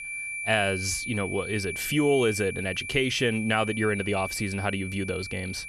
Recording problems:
high-pitched whine; loud; throughout; 2.5 kHz, 6 dB below the speech

